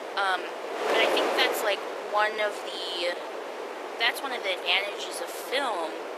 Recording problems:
thin; very; fading below 400 Hz
garbled, watery; slightly; nothing above 13.5 kHz
wind noise on the microphone; heavy; 4 dB below the speech
uneven, jittery; strongly

